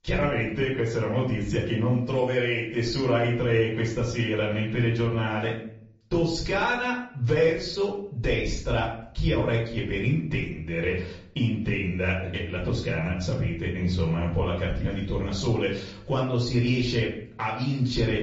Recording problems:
off-mic speech; far
room echo; slight; dies away in 0.5 s
garbled, watery; slightly; nothing above 7.5 kHz

